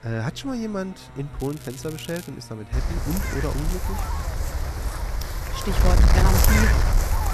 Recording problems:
wind noise on the microphone; heavy; from 2.5 s on; 4 dB above the speech
traffic noise; noticeable; throughout; 15 dB below the speech
crackling; noticeable; at 1.5 s and at 3.5 s; 15 dB below the speech

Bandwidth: 14 kHz